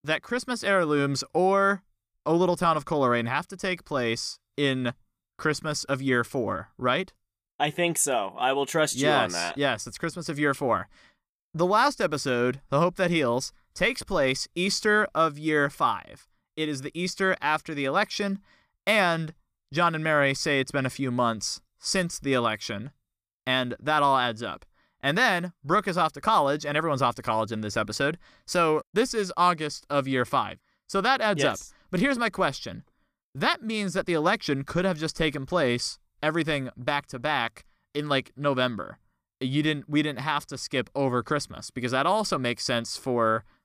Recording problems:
none

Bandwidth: 14.5 kHz